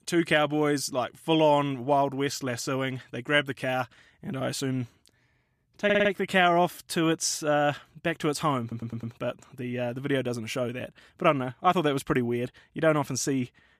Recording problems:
audio stuttering; at 6 s and at 8.5 s

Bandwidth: 14.5 kHz